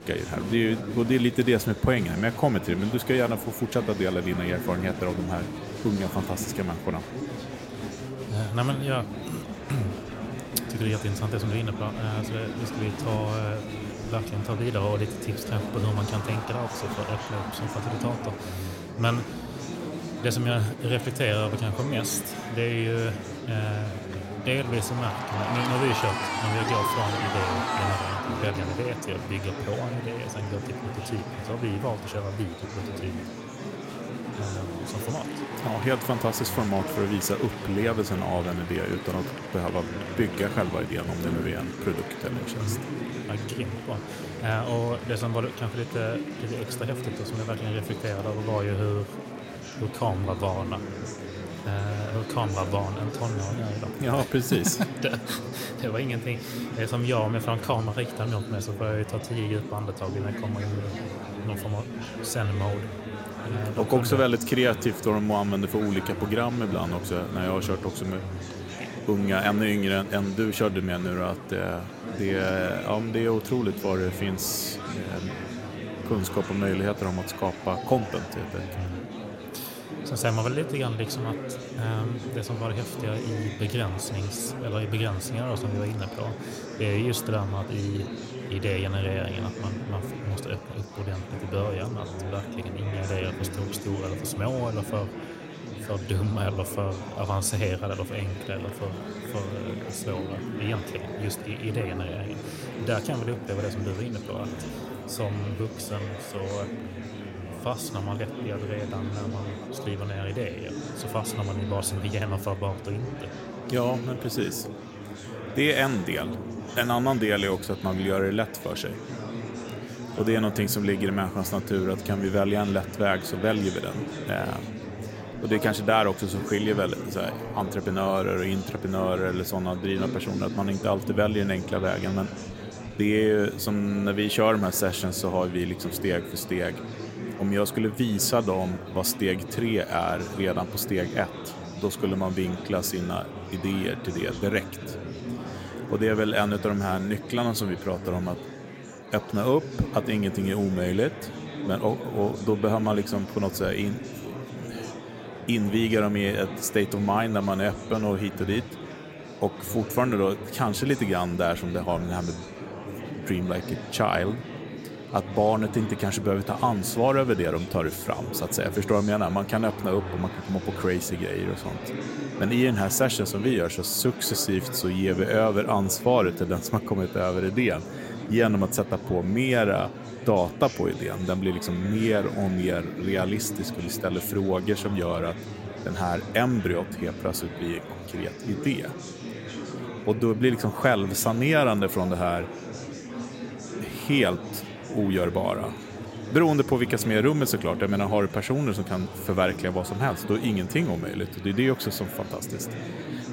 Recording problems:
murmuring crowd; loud; throughout; 8 dB below the speech

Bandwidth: 16 kHz